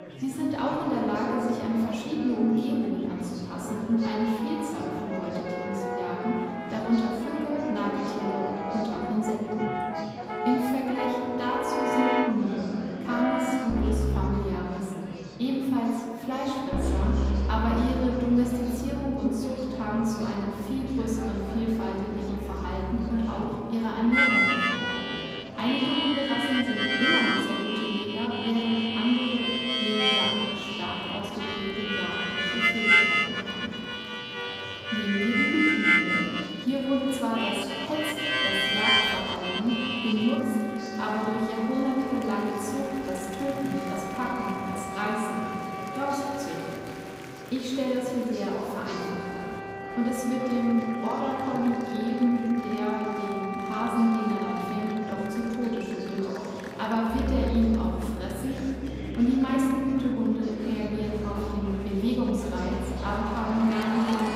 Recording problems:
off-mic speech; far
room echo; noticeable; dies away in 2.2 s
background music; loud; throughout; 1 dB below the speech
murmuring crowd; noticeable; throughout; 15 dB below the speech

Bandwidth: 15.5 kHz